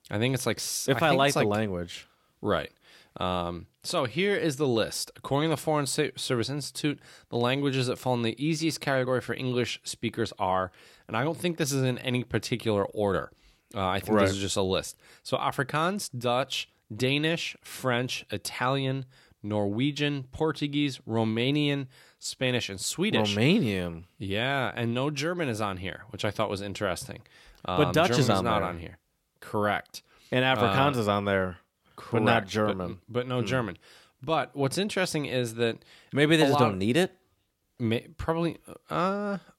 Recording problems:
none

